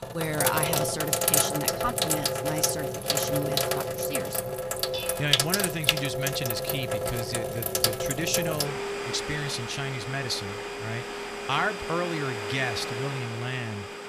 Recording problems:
household noises; very loud; throughout; 4 dB above the speech
clattering dishes; noticeable; from 5 to 9.5 s; peak 4 dB below the speech

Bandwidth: 15 kHz